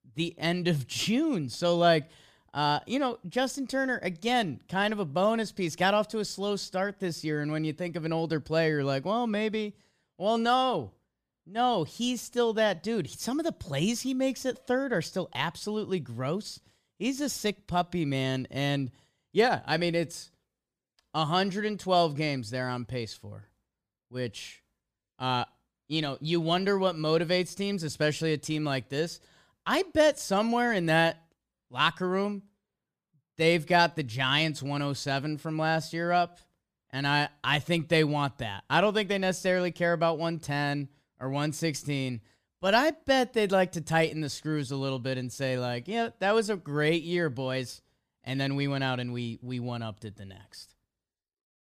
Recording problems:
none

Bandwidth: 15 kHz